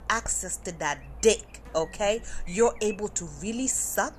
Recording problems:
electrical hum; noticeable; throughout; 50 Hz, 20 dB below the speech

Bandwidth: 13.5 kHz